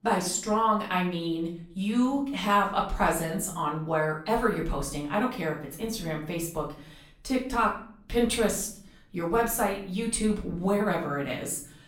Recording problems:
off-mic speech; far
room echo; slight; dies away in 0.5 s

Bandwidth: 16.5 kHz